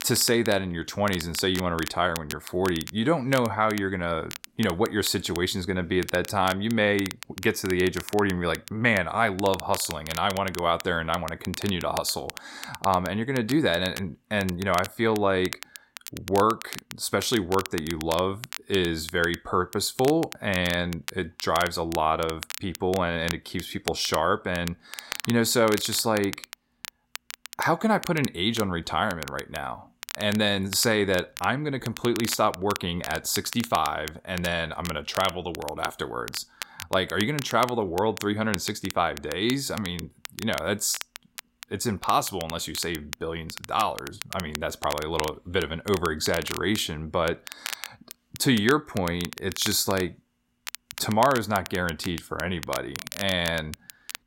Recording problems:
crackle, like an old record; noticeable; 10 dB below the speech

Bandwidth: 16 kHz